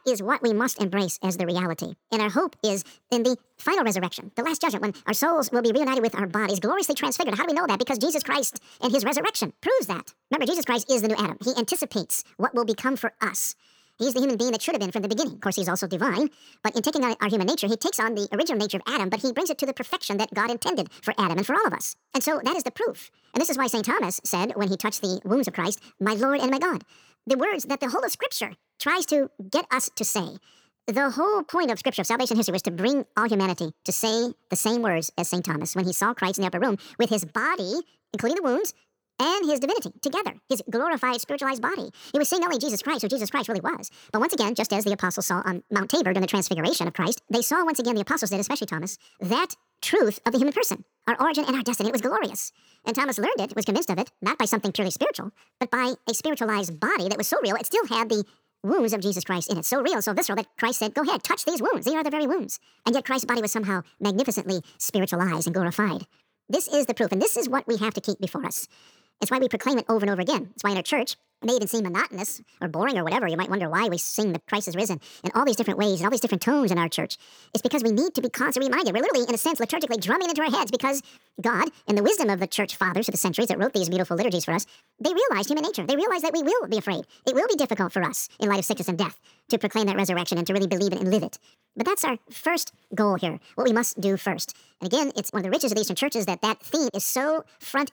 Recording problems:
wrong speed and pitch; too fast and too high; 1.6 times normal speed

